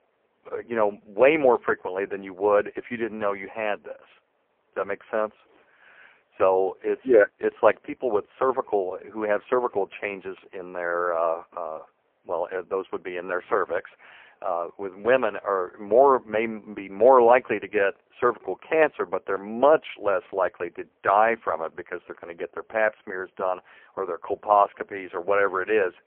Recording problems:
phone-call audio; poor line

